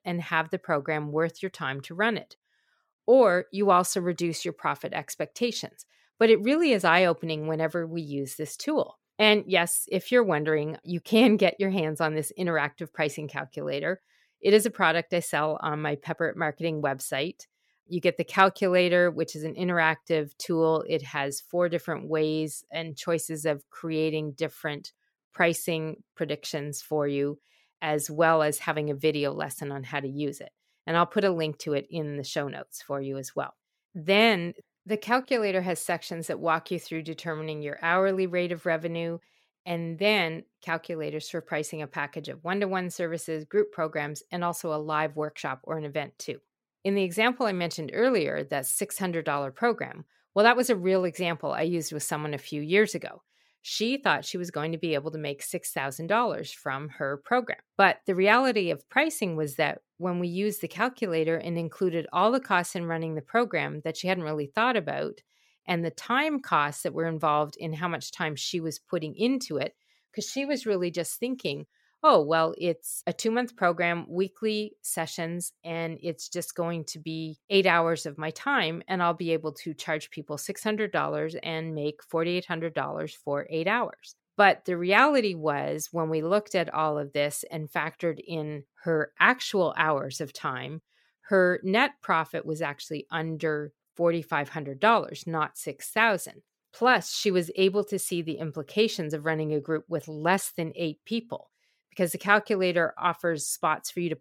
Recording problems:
none

